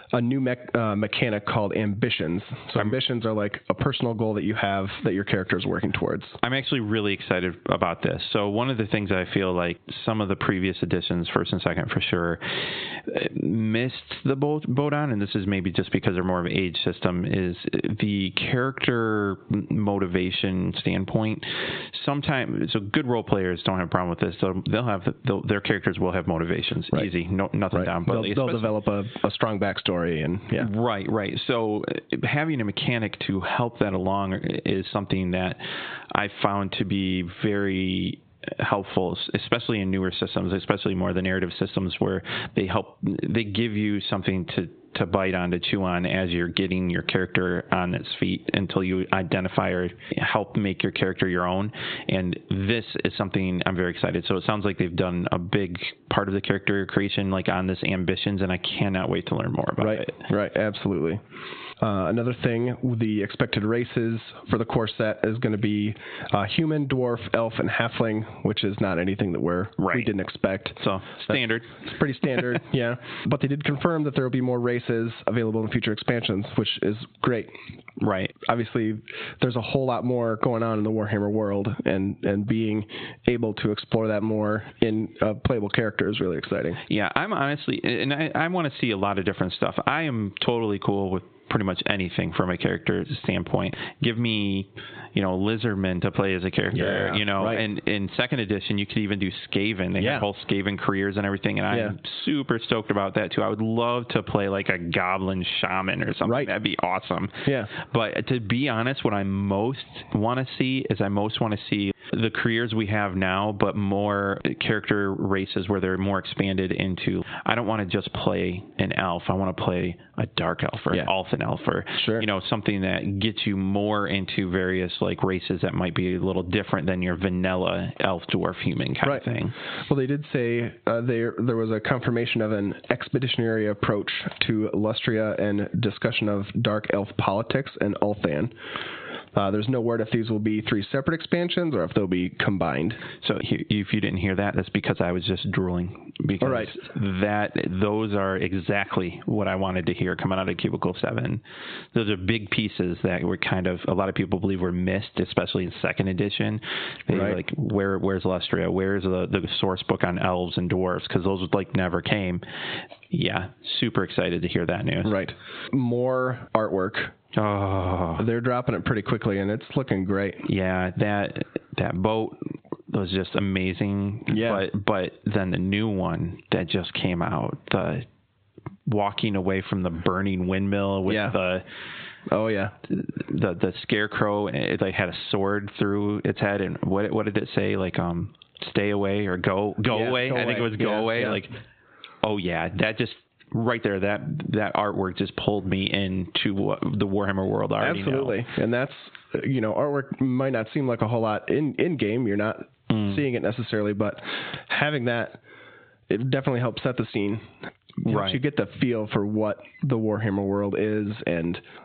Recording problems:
high frequencies cut off; severe; nothing above 4 kHz
squashed, flat; heavily

